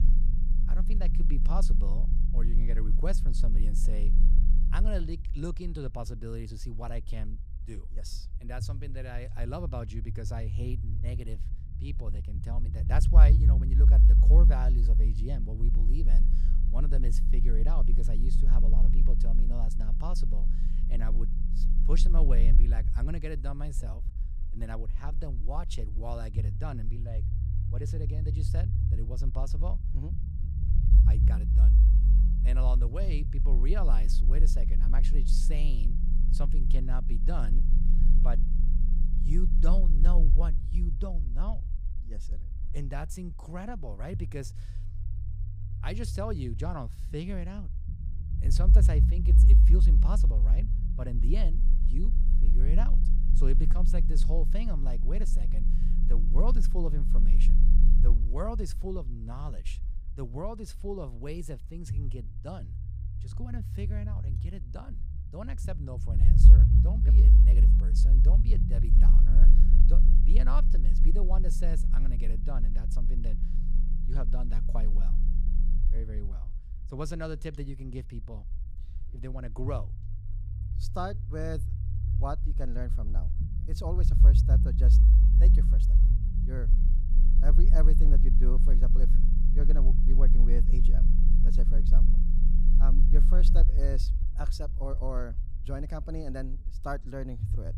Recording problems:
low rumble; loud; throughout; 4 dB below the speech

